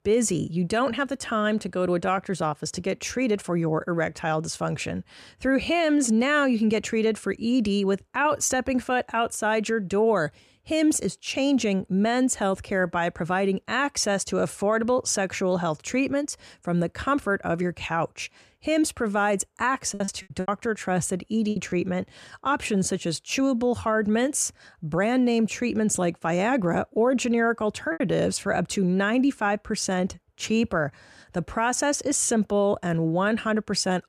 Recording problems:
choppy; very; from 20 to 22 s and at 28 s; 13% of the speech affected

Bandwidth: 14.5 kHz